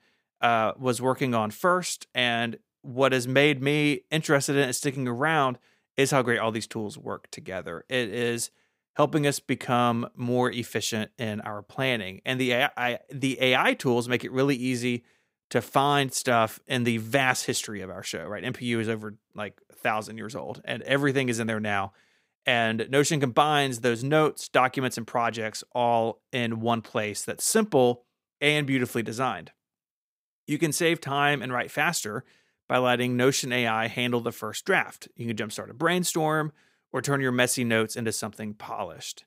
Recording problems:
none

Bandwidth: 15.5 kHz